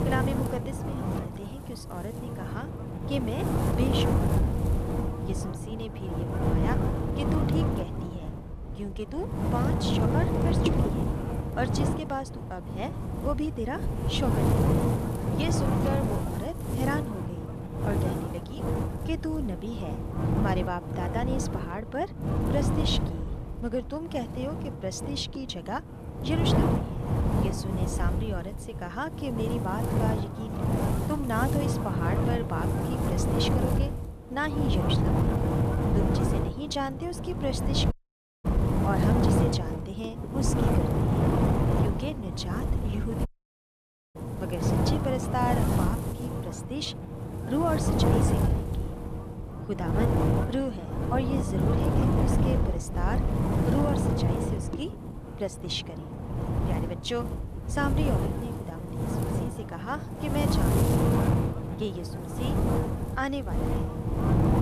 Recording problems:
wind noise on the microphone; heavy; 1 dB above the speech
audio cutting out; at 38 s for 0.5 s and at 43 s for 1 s

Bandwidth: 14.5 kHz